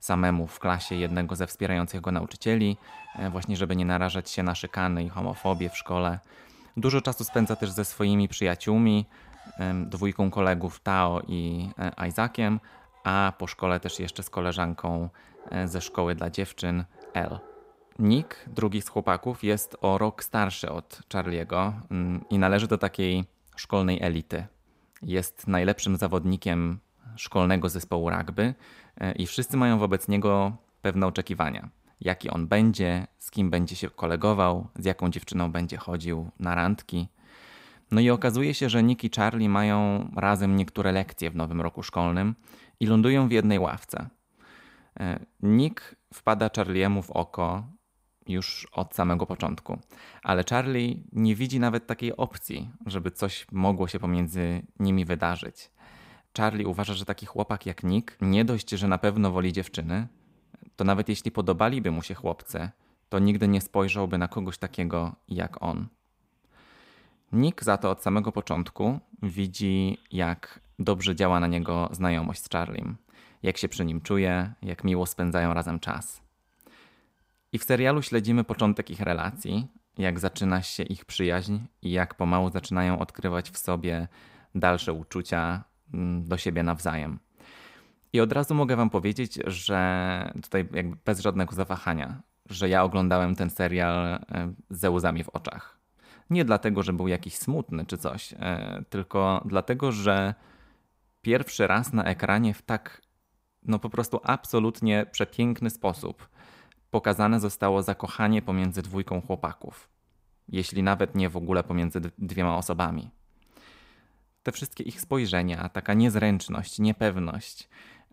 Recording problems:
animal sounds; faint; throughout; 25 dB below the speech

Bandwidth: 15.5 kHz